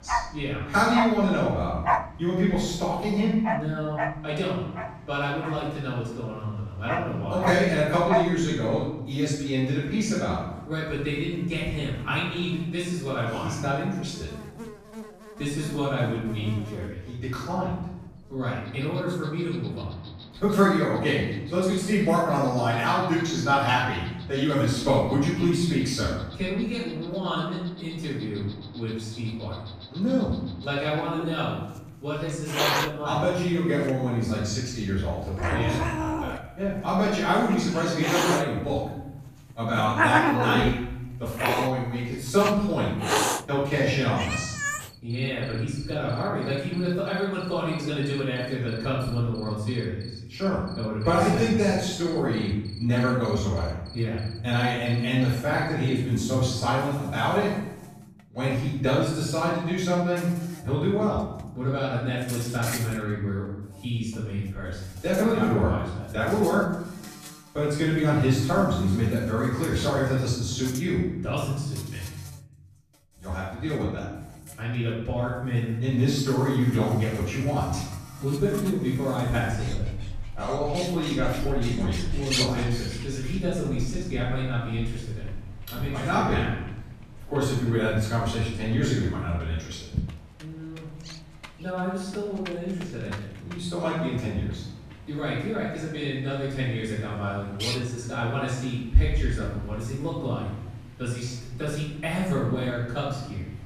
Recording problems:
off-mic speech; far
room echo; noticeable; dies away in 1 s
animal sounds; loud; throughout; 7 dB below the speech

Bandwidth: 14.5 kHz